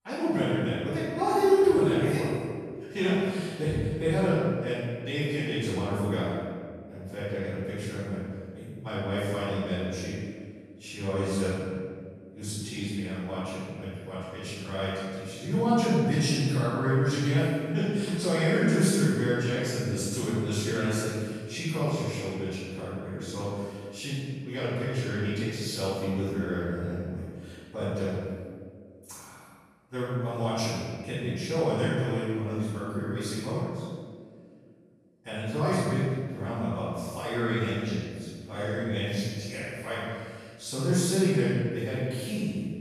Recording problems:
room echo; strong; dies away in 1.7 s
off-mic speech; far

